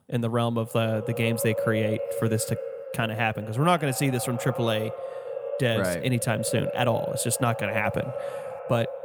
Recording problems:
echo of what is said; strong; throughout; 180 ms later, 7 dB below the speech

